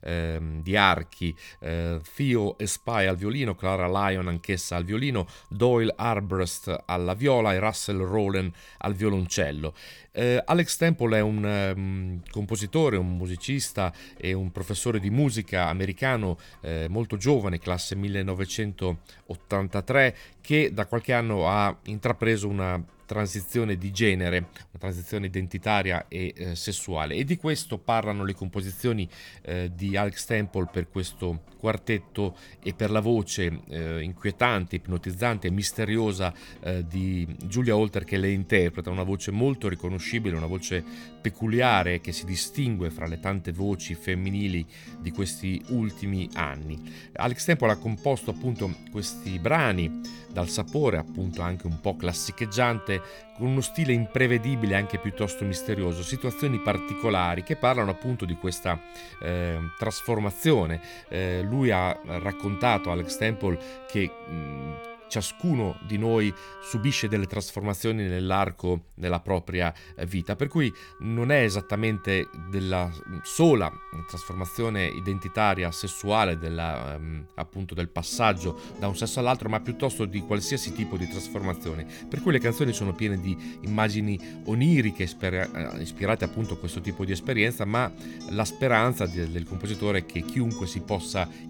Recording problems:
background music; noticeable; throughout; 15 dB below the speech

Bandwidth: 18.5 kHz